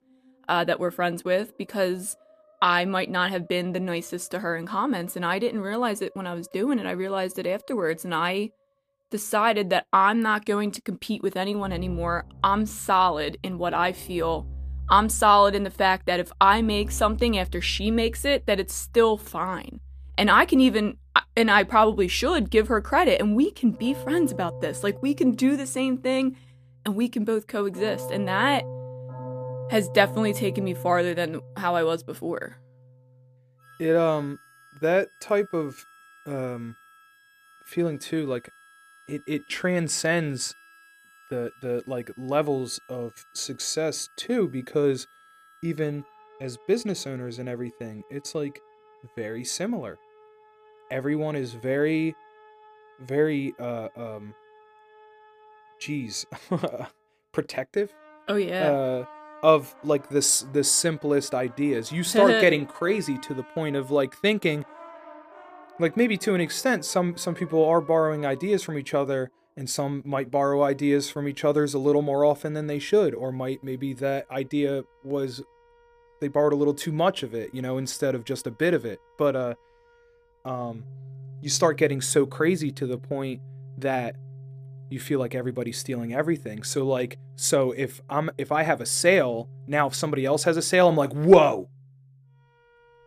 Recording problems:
background music; noticeable; throughout; 20 dB below the speech

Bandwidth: 14.5 kHz